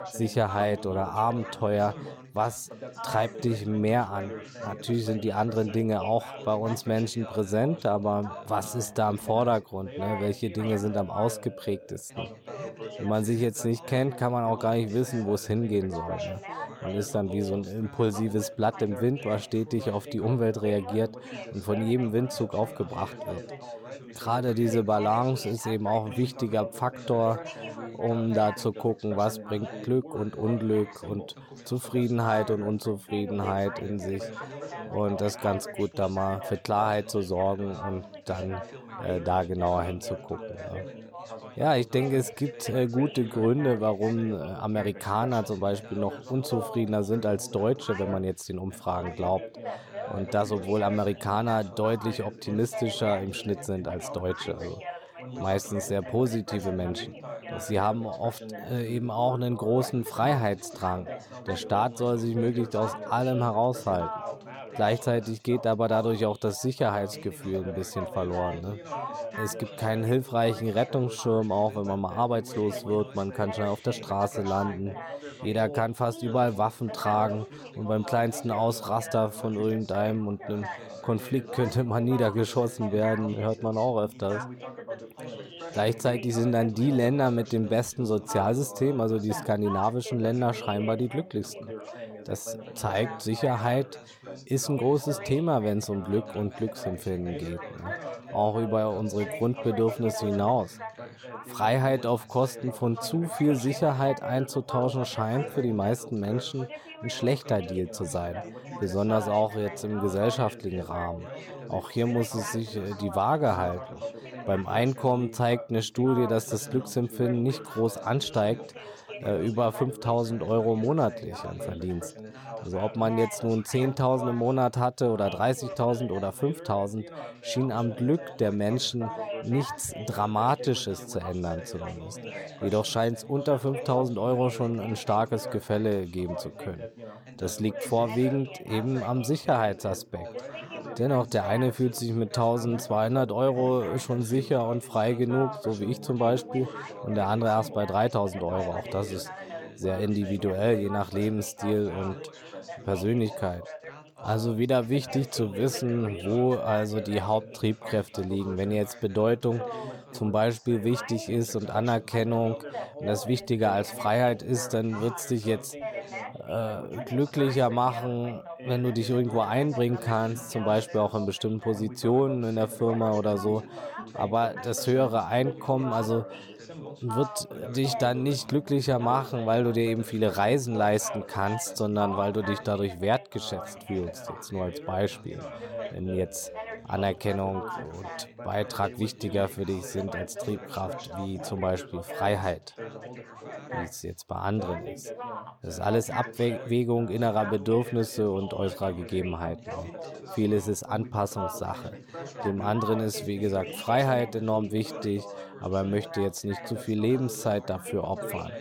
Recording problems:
background chatter; noticeable; throughout; 3 voices, 10 dB below the speech

